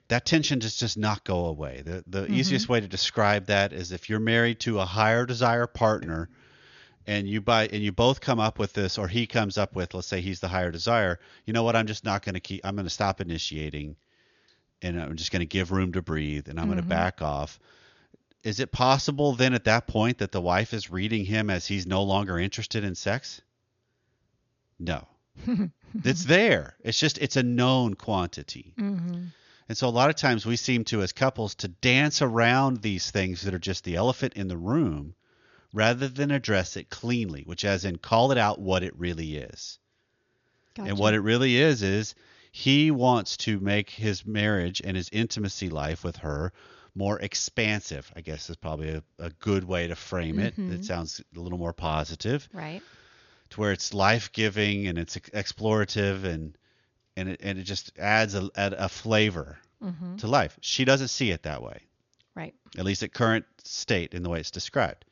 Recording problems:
high frequencies cut off; noticeable; nothing above 7 kHz

